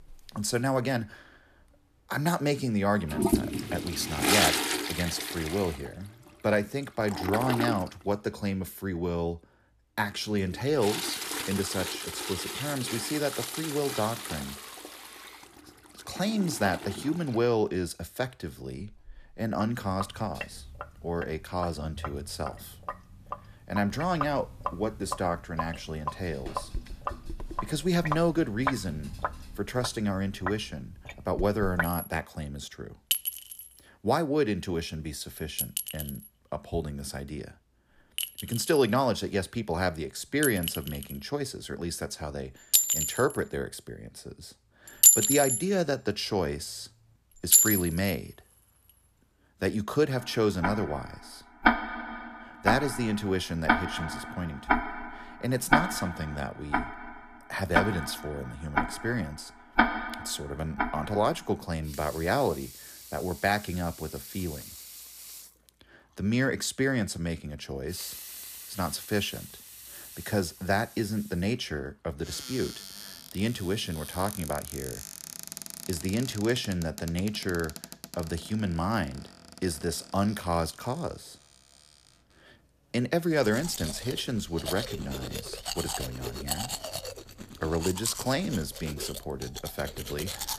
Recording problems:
household noises; very loud; throughout; as loud as the speech

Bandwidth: 14.5 kHz